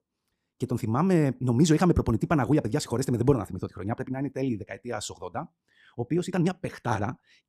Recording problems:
wrong speed, natural pitch; too fast; 1.5 times normal speed

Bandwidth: 14.5 kHz